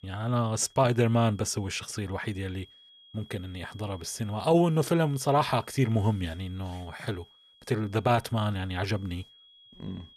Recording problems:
high-pitched whine; faint; throughout; 3.5 kHz, 25 dB below the speech

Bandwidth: 14.5 kHz